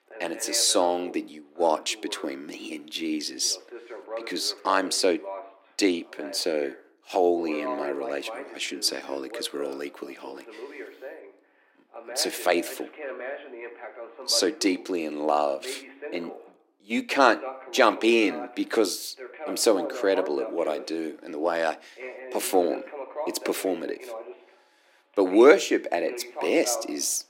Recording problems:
thin; somewhat; fading below 300 Hz
voice in the background; noticeable; throughout; 15 dB below the speech

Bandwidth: 16 kHz